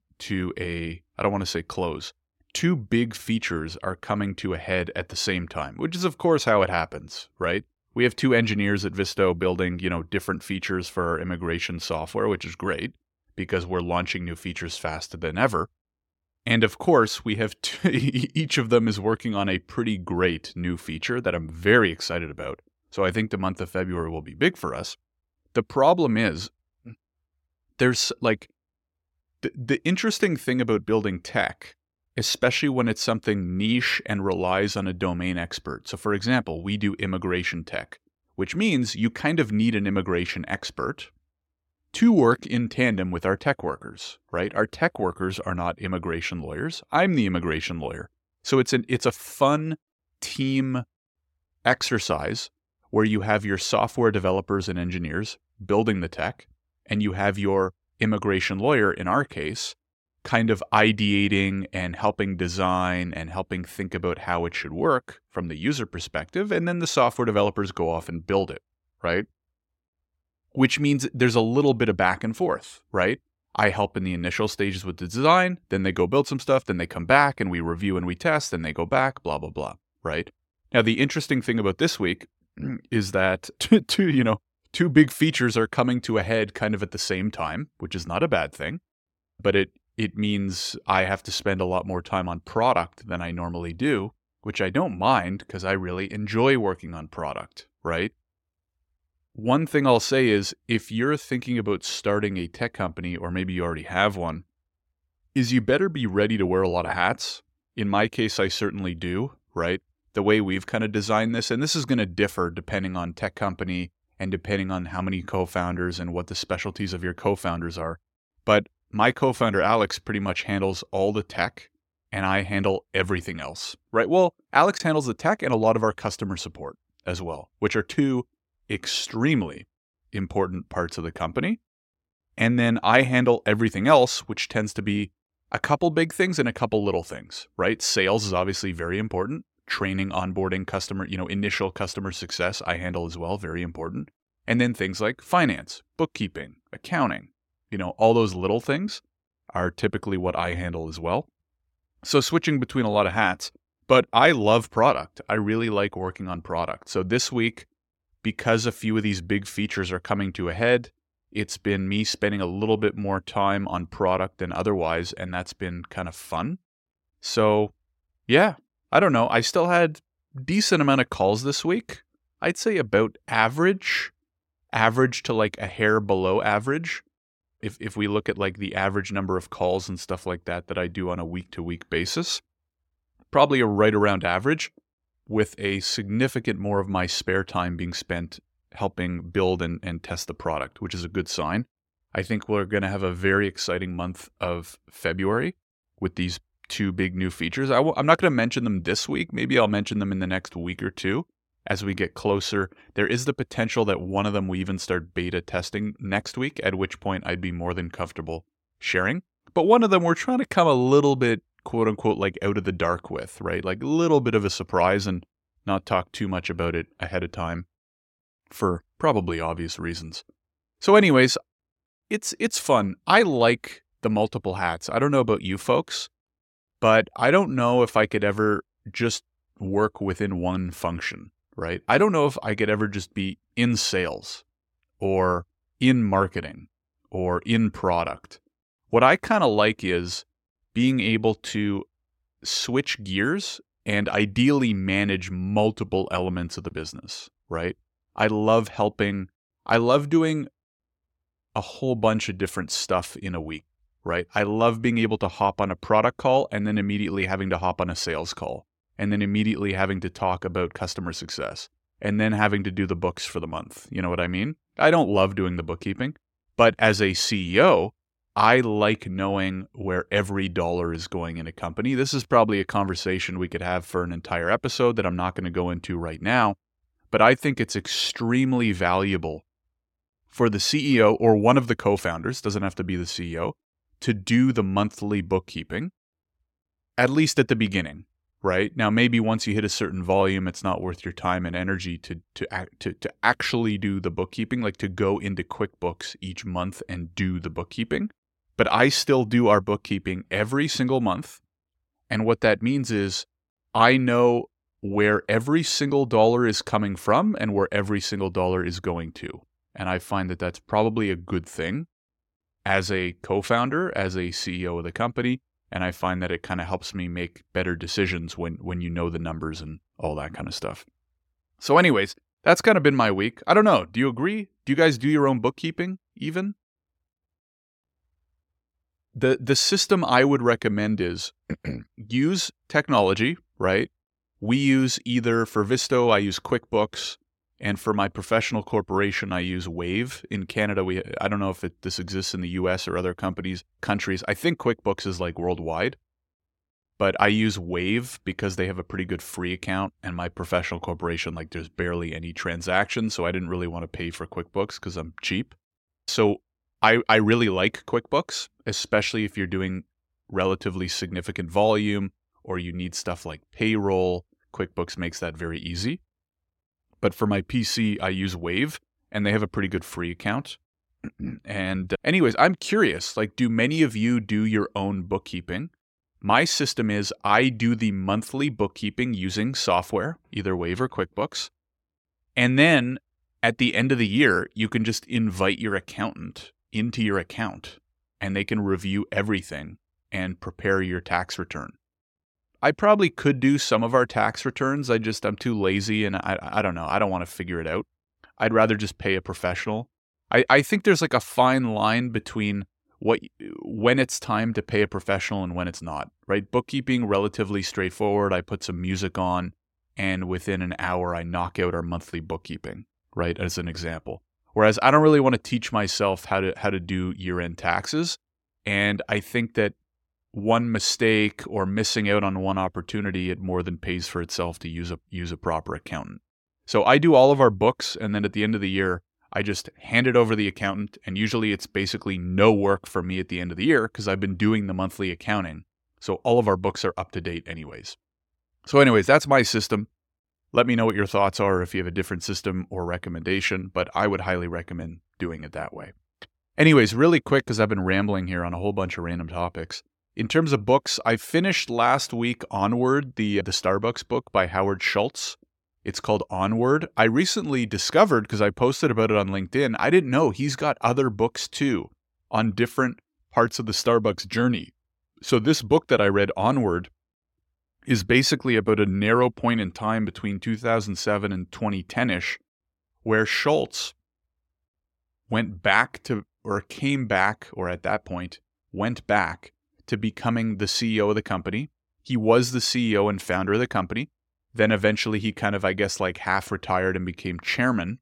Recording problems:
none

